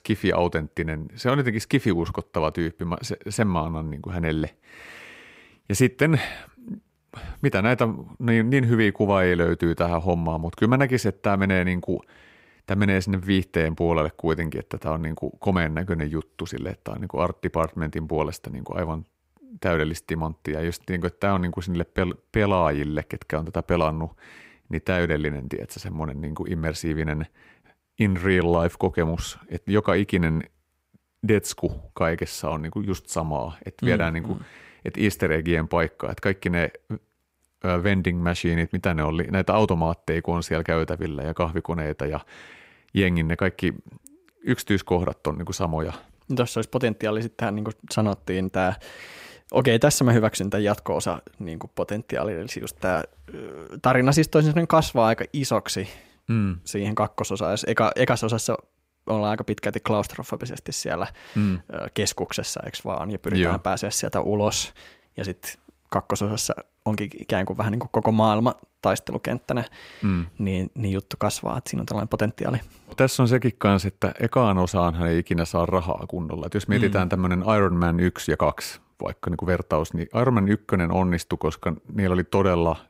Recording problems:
none

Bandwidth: 15.5 kHz